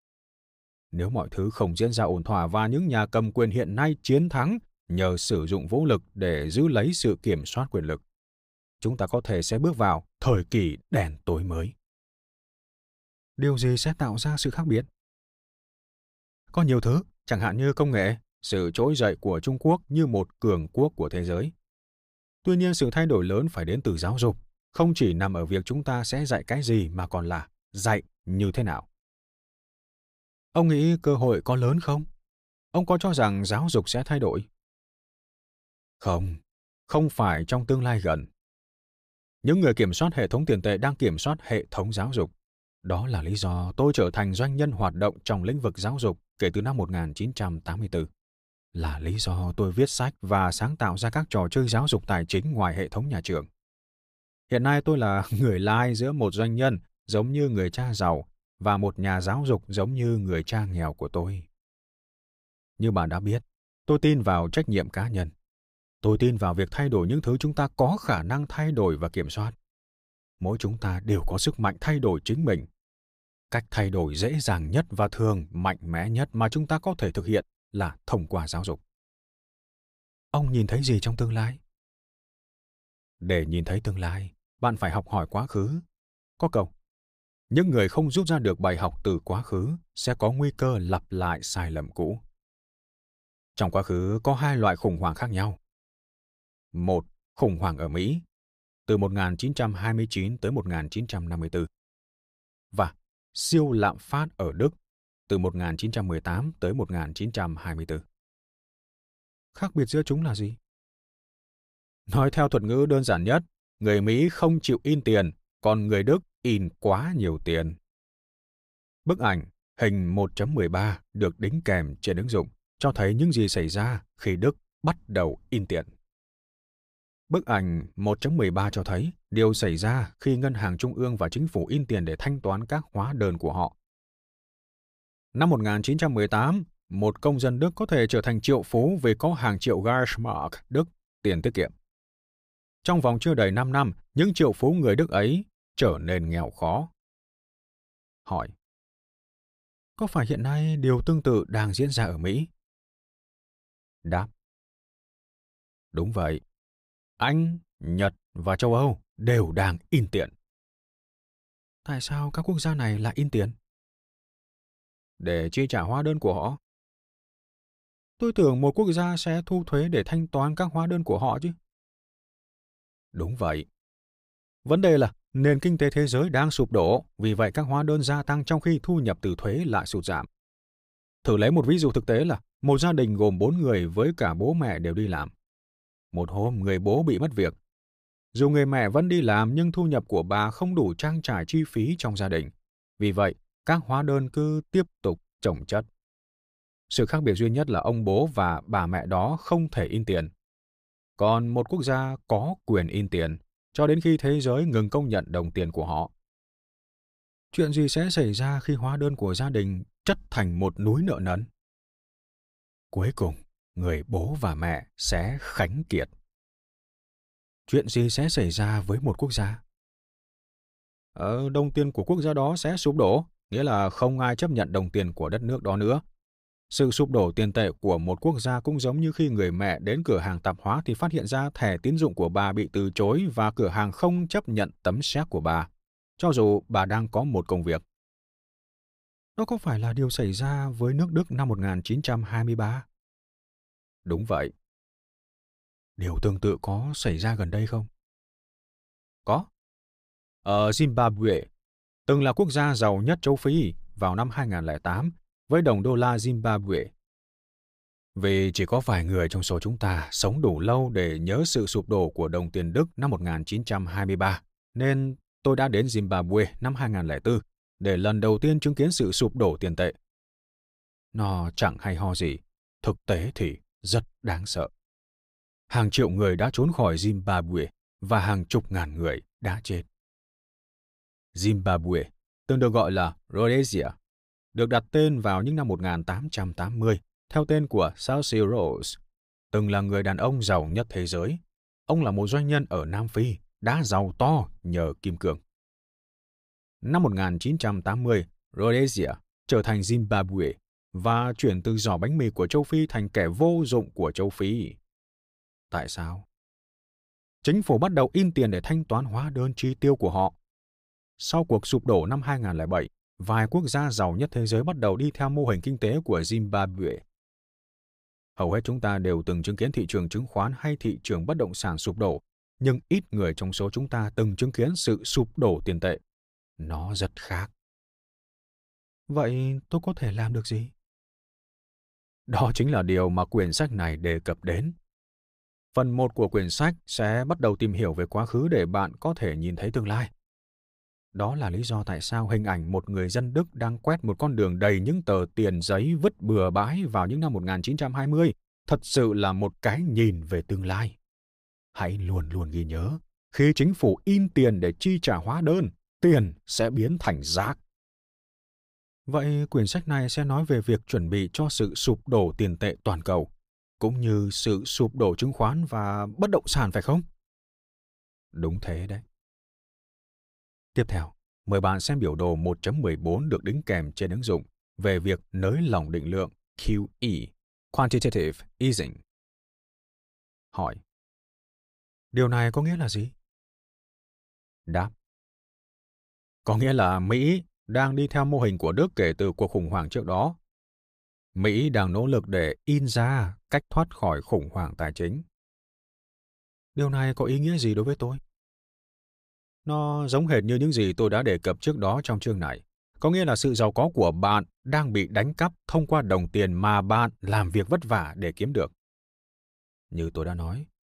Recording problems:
none

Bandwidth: 15 kHz